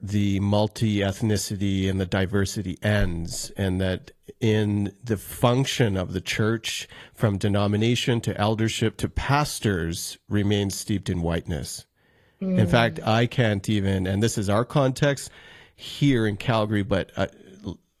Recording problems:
garbled, watery; slightly; nothing above 12.5 kHz

